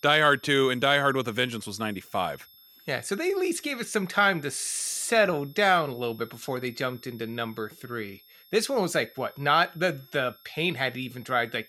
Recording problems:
high-pitched whine; faint; throughout; 11.5 kHz, 25 dB below the speech

